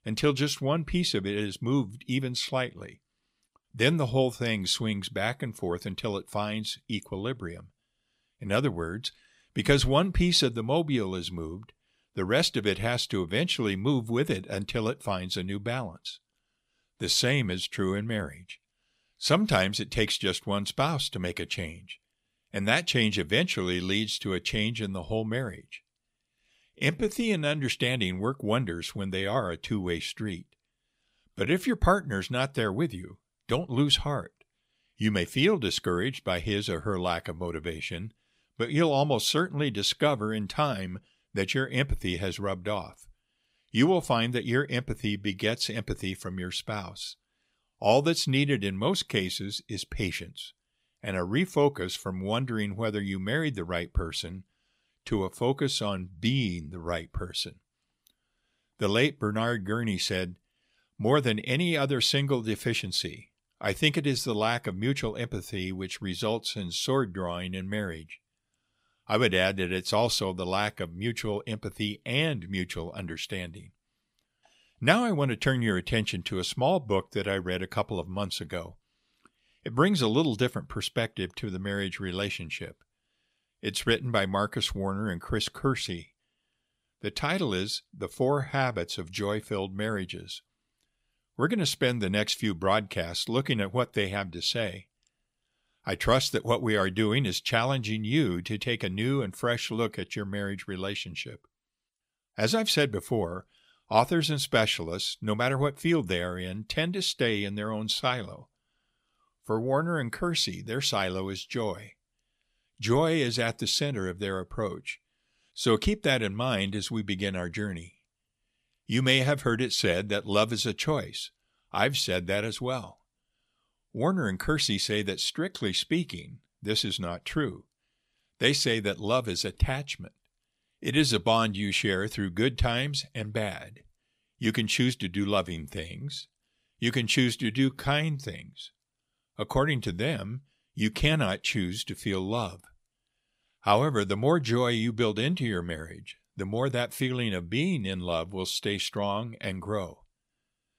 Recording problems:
uneven, jittery; strongly; from 27 s to 2:18

